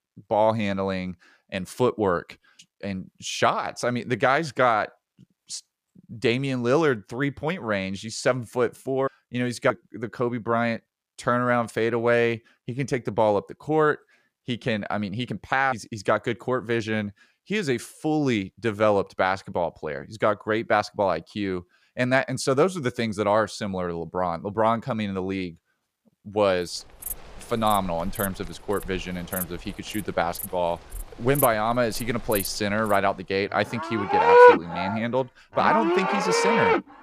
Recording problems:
animal sounds; very loud; from 27 s on; 4 dB above the speech

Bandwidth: 15 kHz